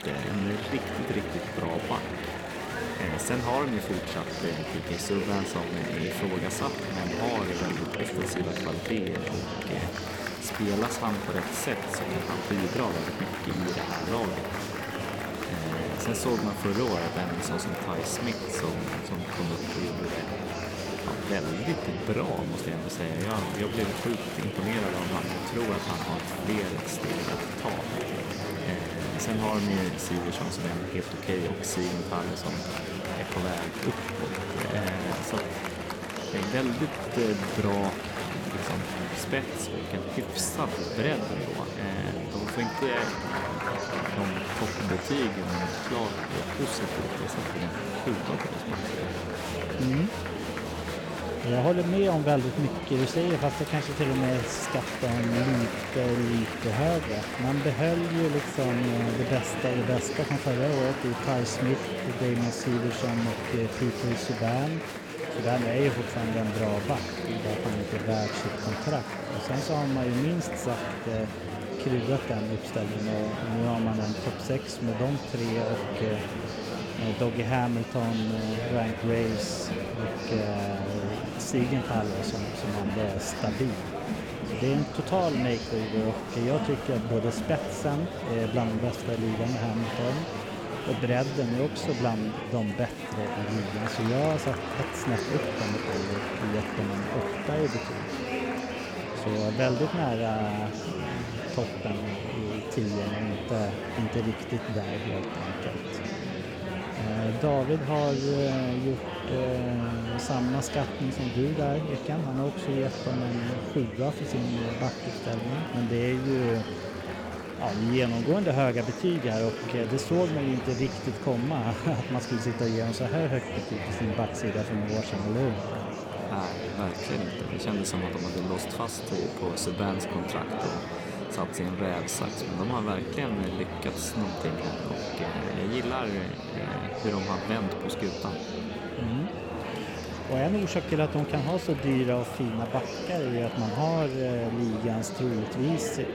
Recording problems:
murmuring crowd; loud; throughout; 3 dB below the speech

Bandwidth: 17.5 kHz